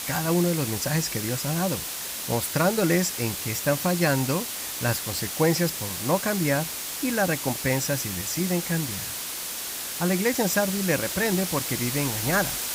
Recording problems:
hiss; loud; throughout; 3 dB below the speech

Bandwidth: 15.5 kHz